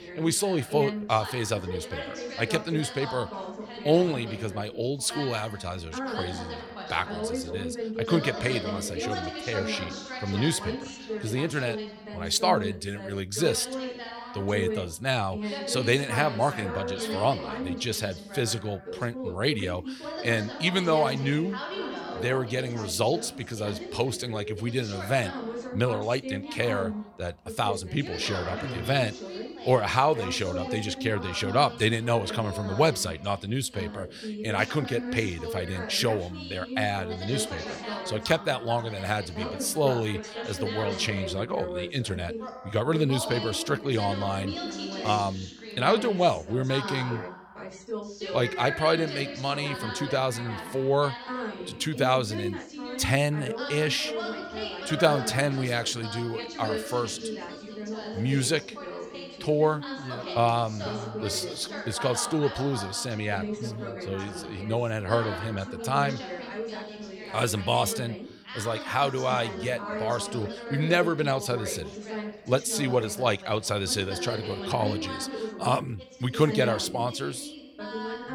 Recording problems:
background chatter; loud; throughout; 2 voices, 8 dB below the speech

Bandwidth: 17.5 kHz